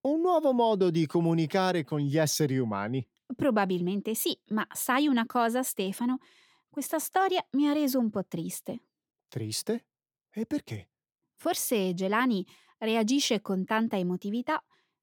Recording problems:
none

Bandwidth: 17.5 kHz